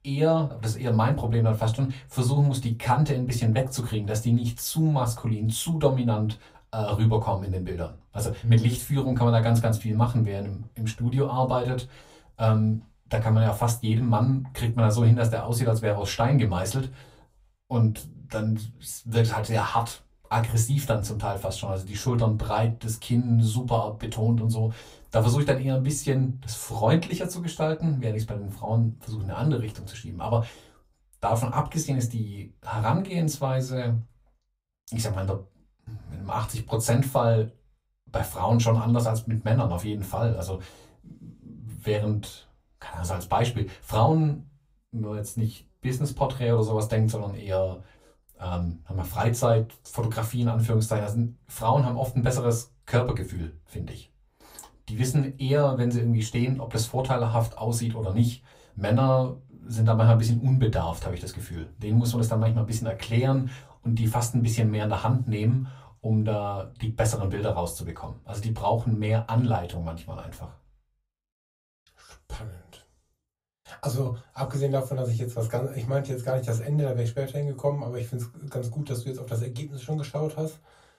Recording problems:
off-mic speech; far
room echo; very slight; dies away in 0.2 s

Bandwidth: 15.5 kHz